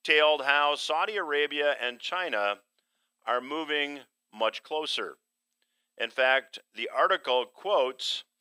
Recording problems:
thin; somewhat; fading below 550 Hz

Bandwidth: 15.5 kHz